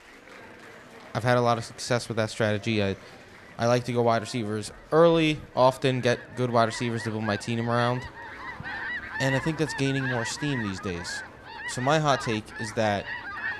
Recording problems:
animal sounds; loud; throughout; 9 dB below the speech
murmuring crowd; faint; throughout; 25 dB below the speech

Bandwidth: 13.5 kHz